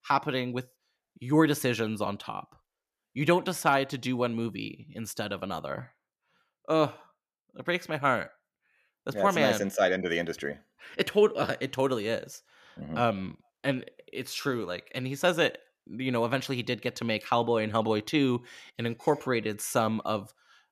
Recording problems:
none

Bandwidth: 14.5 kHz